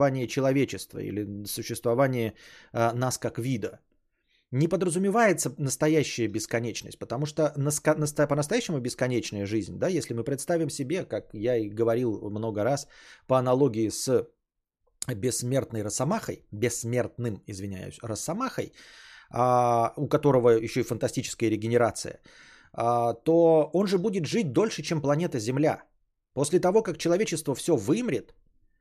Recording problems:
abrupt cut into speech; at the start

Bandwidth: 14.5 kHz